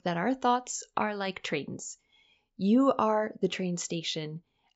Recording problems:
high frequencies cut off; noticeable; nothing above 8 kHz

